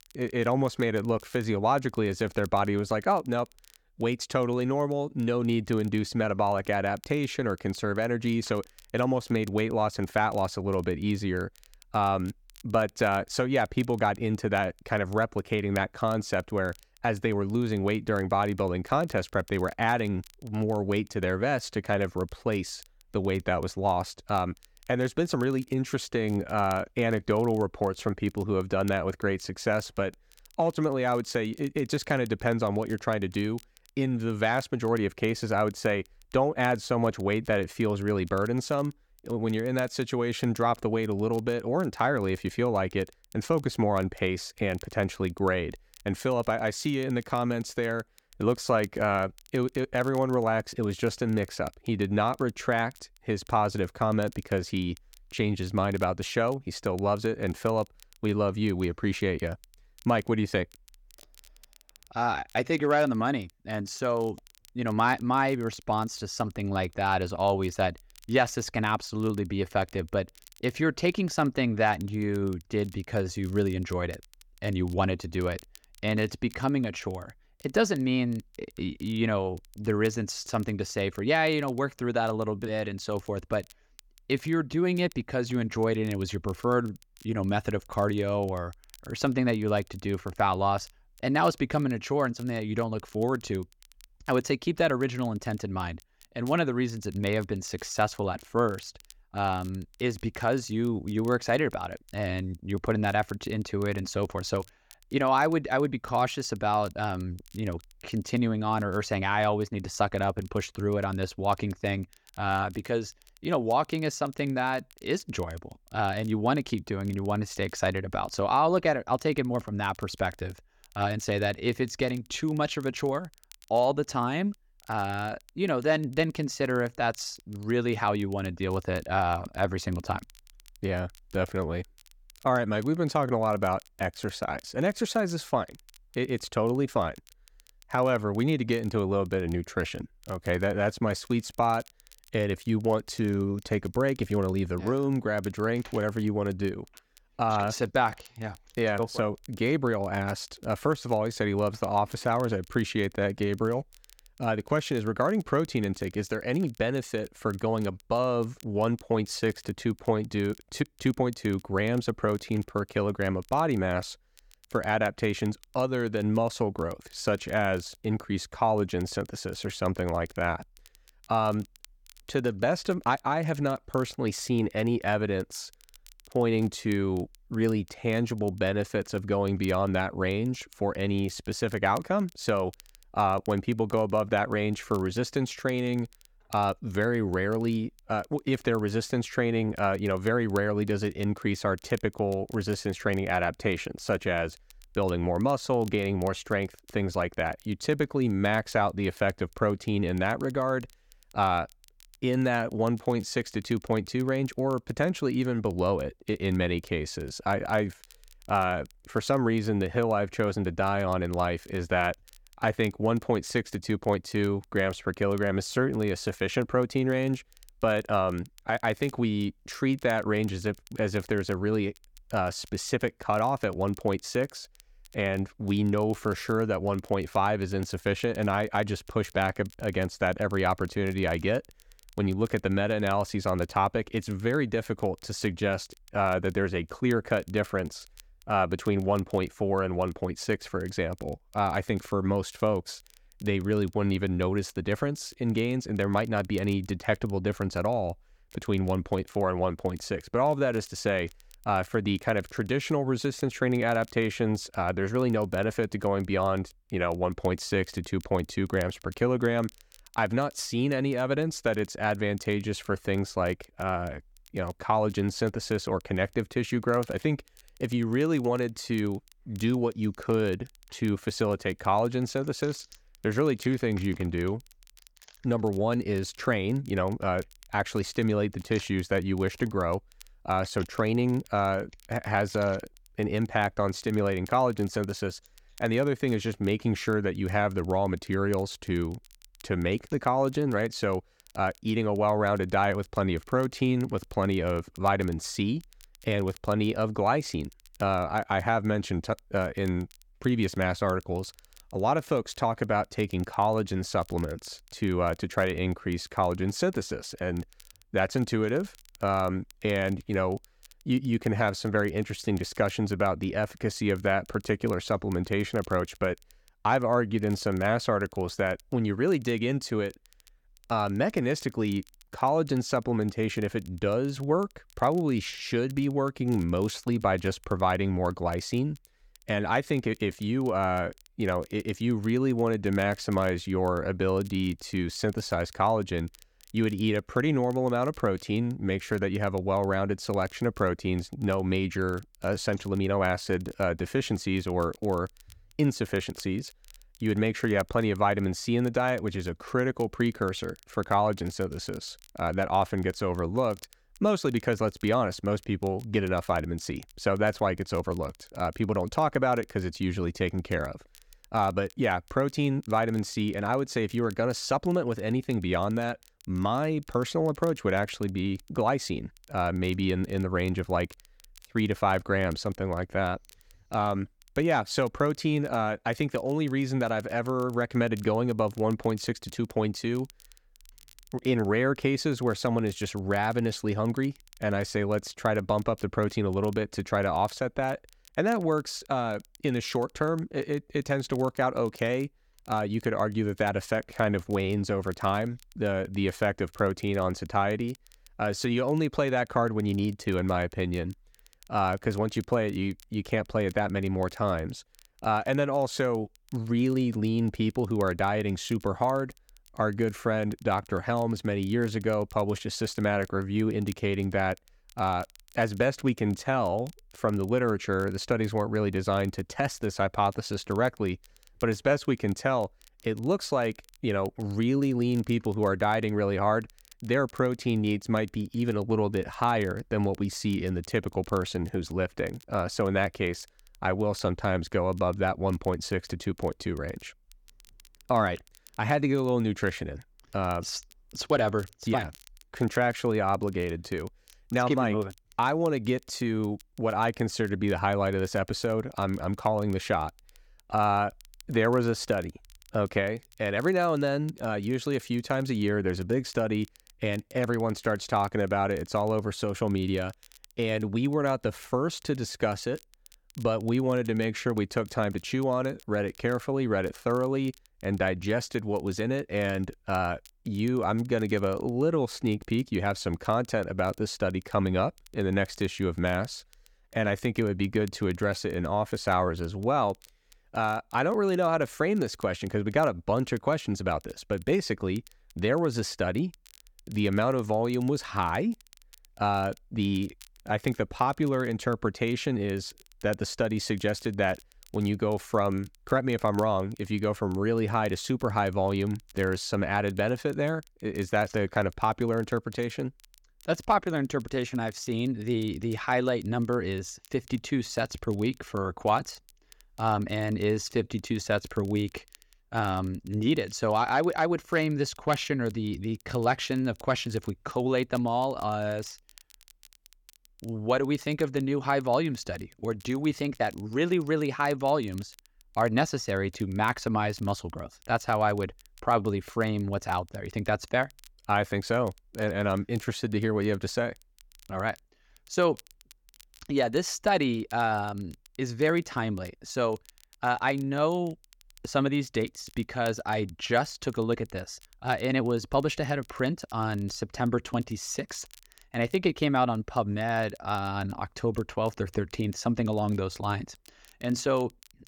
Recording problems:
crackle, like an old record; faint; 25 dB below the speech

